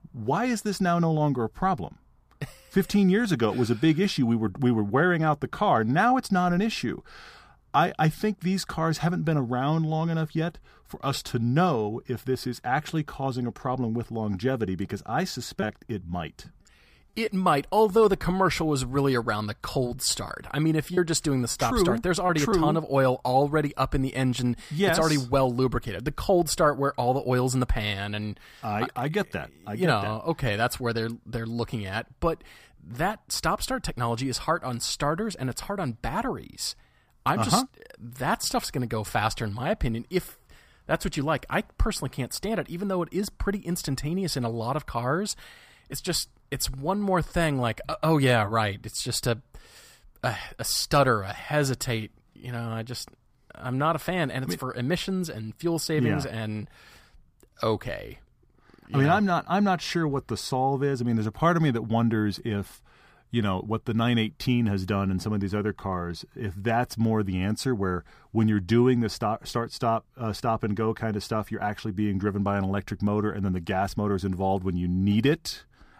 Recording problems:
choppy; very; from 16 to 17 s and from 20 to 23 s; 5% of the speech affected

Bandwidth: 15 kHz